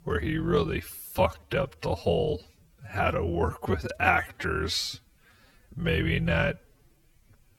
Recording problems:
wrong speed, natural pitch; too slow; 0.5 times normal speed

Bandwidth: 18 kHz